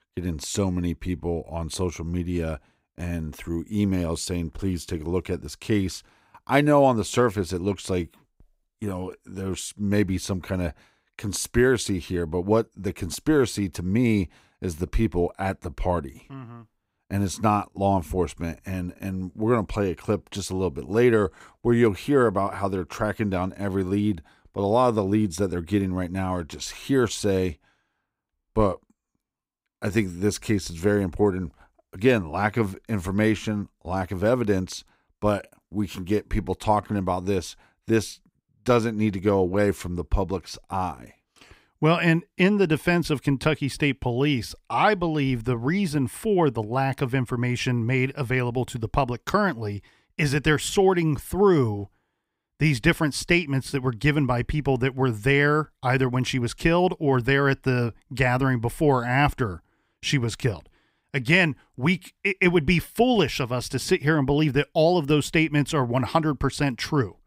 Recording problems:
none

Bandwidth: 15.5 kHz